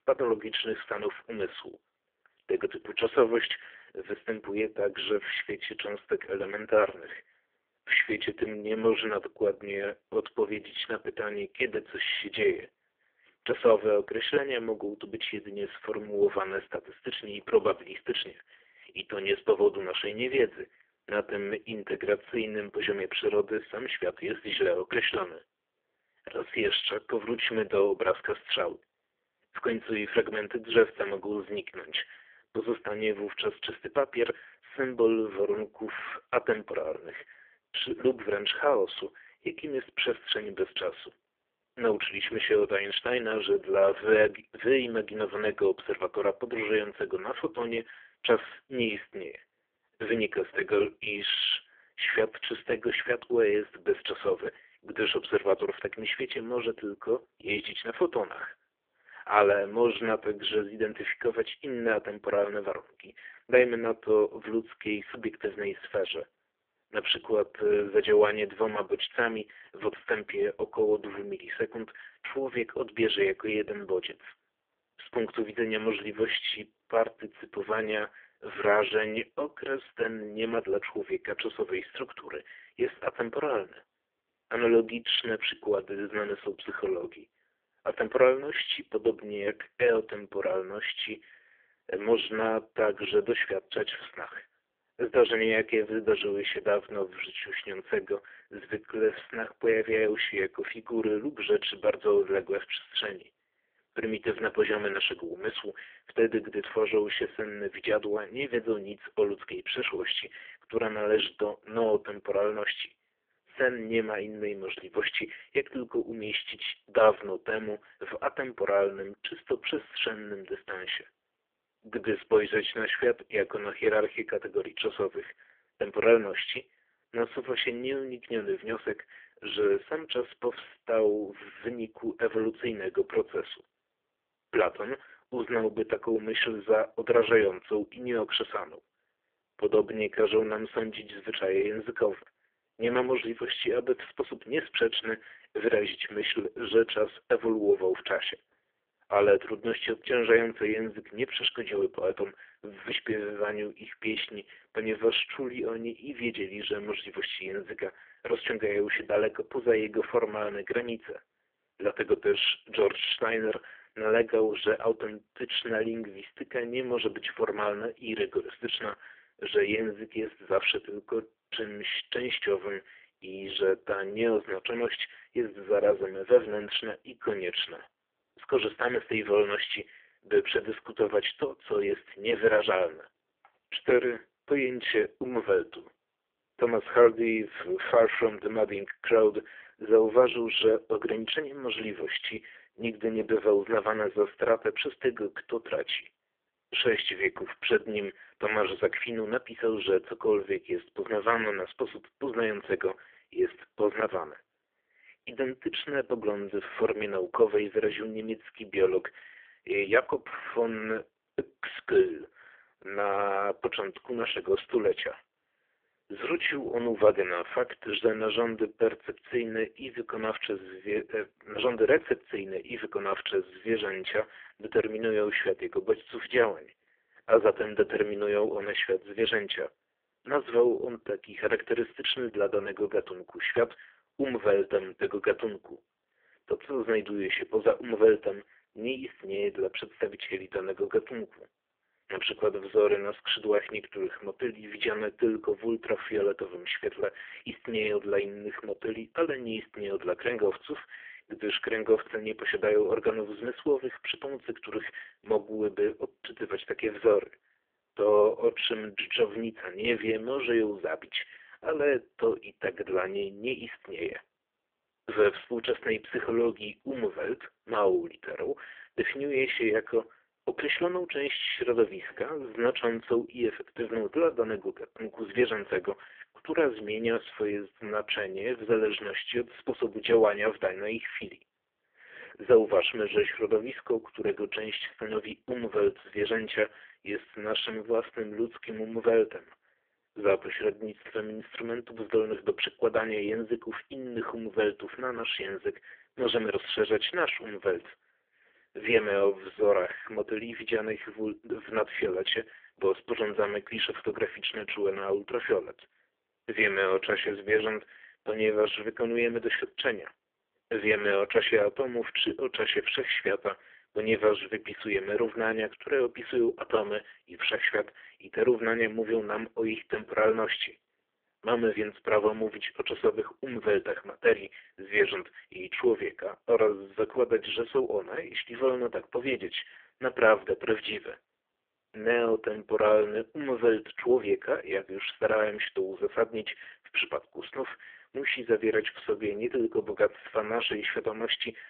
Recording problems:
phone-call audio; poor line; nothing above 3.5 kHz

